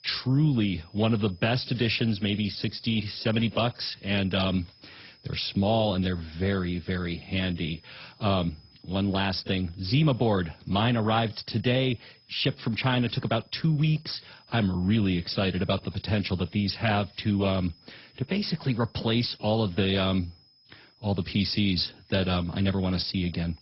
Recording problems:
garbled, watery; badly; nothing above 5.5 kHz
high-pitched whine; faint; throughout; 5 kHz, 30 dB below the speech

